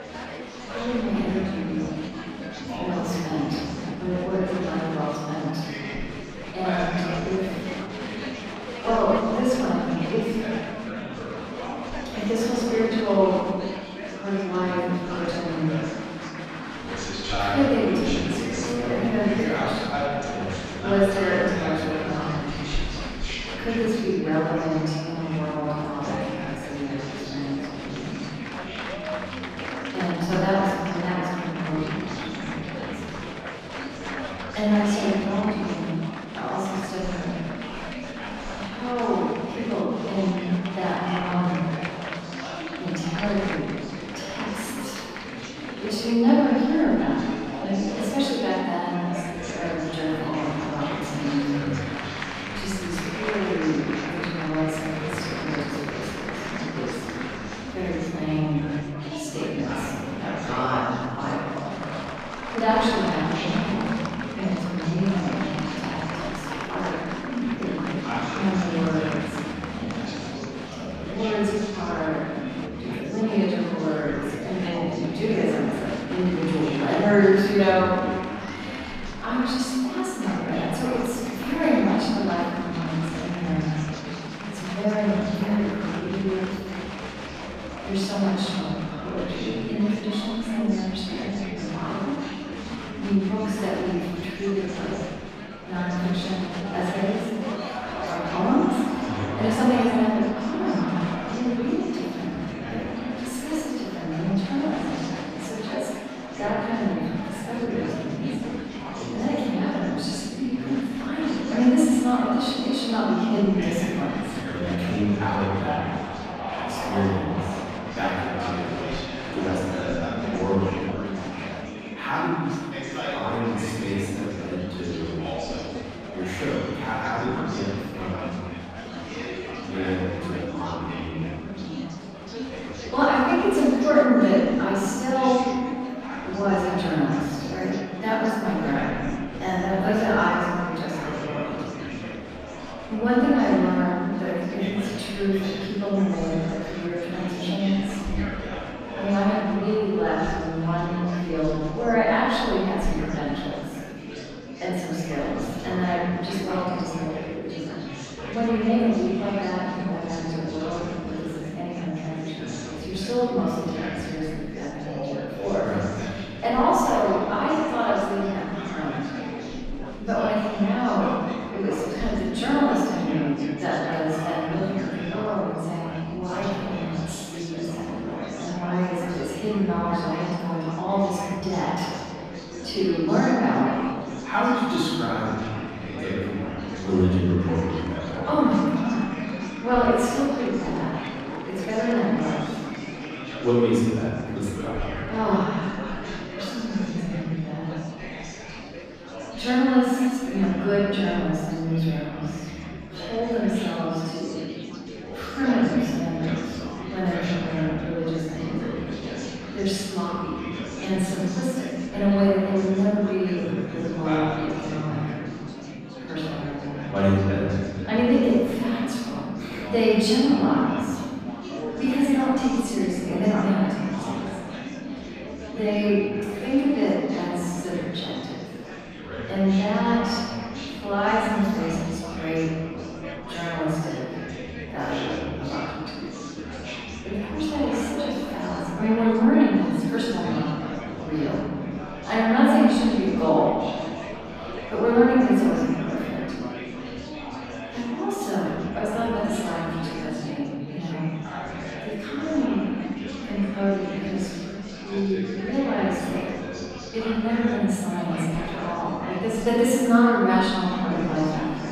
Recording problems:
room echo; strong; dies away in 1.9 s
off-mic speech; far
murmuring crowd; loud; throughout; 8 dB below the speech

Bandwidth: 14.5 kHz